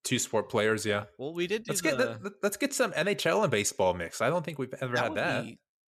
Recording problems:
none

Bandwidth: 14 kHz